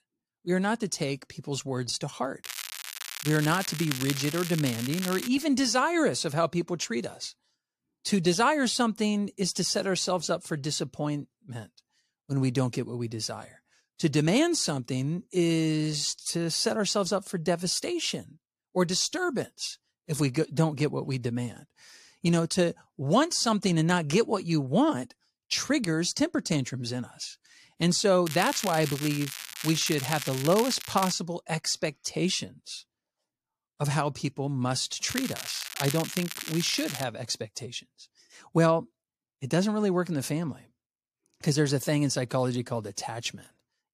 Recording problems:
crackling; loud; from 2.5 to 5.5 s, from 28 to 31 s and from 35 to 37 s; 7 dB below the speech

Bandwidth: 14.5 kHz